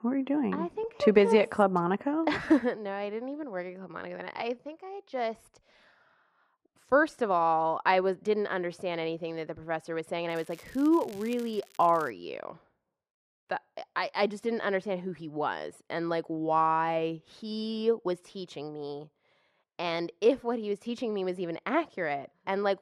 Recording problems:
muffled; very; fading above 3 kHz
crackling; faint; from 10 to 12 s; 25 dB below the speech

